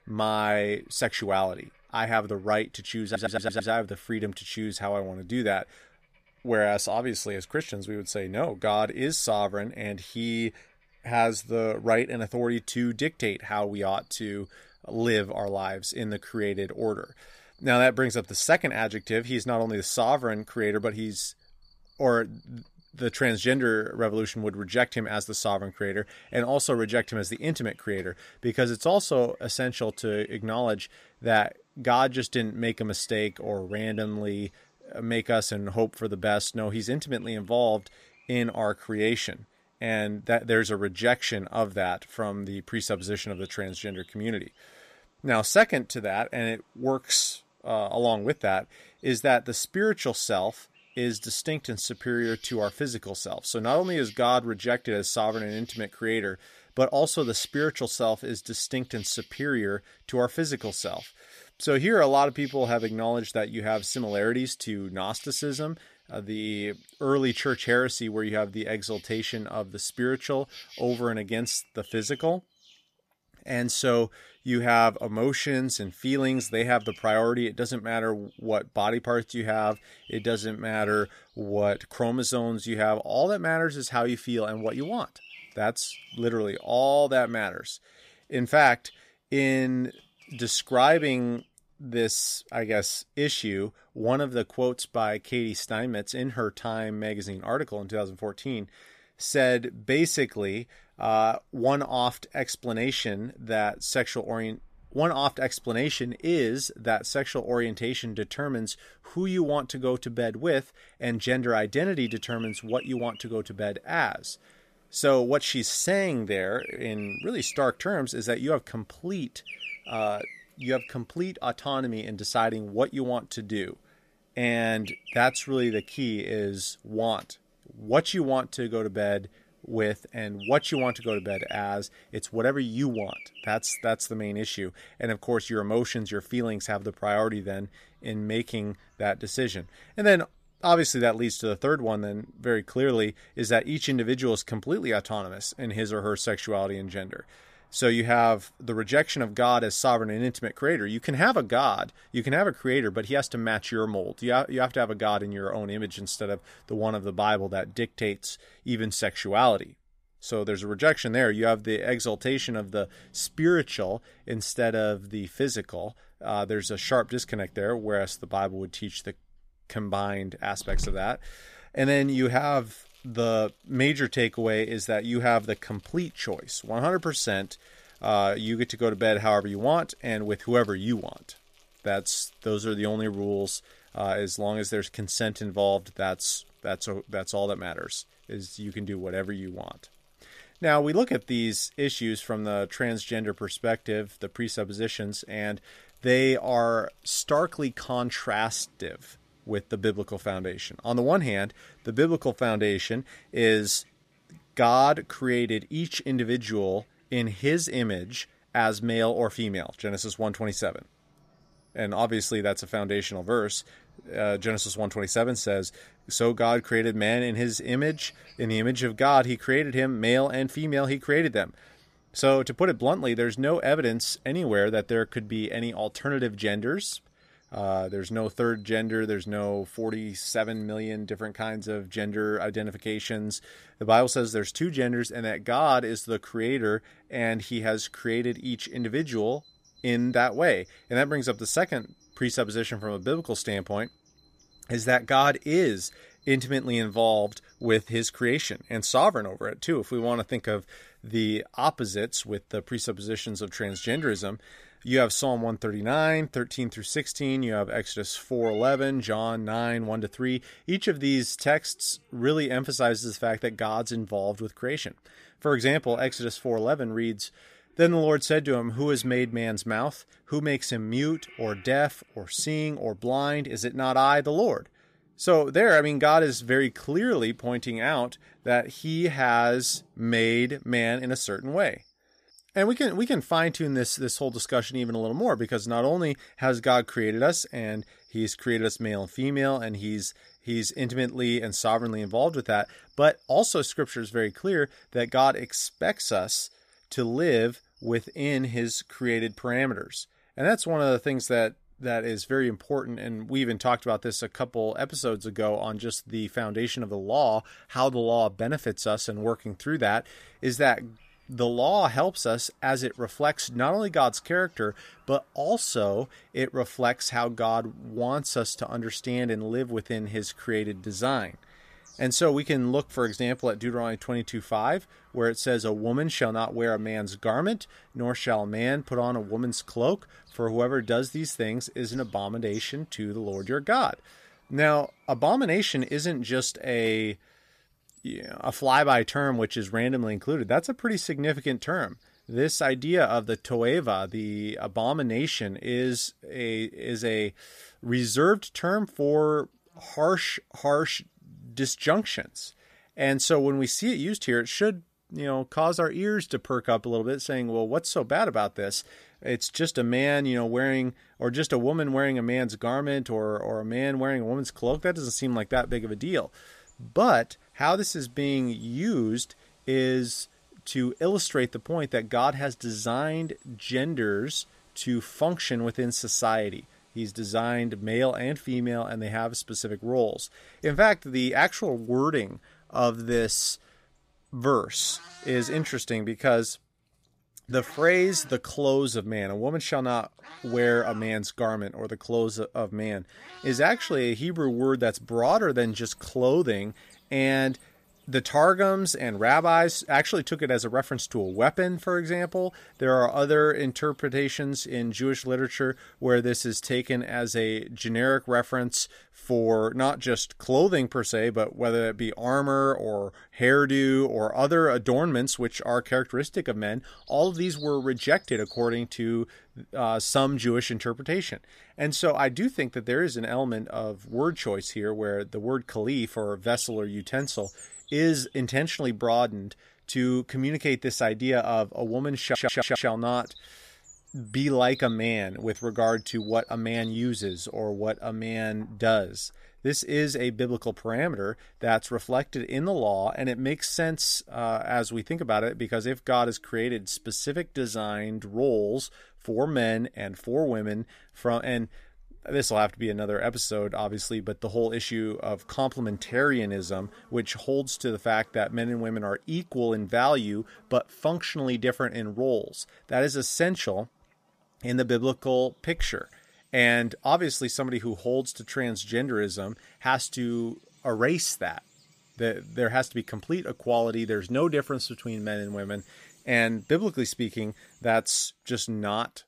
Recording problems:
animal sounds; faint; throughout; 25 dB below the speech
audio stuttering; at 3 s and at 7:12

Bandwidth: 14.5 kHz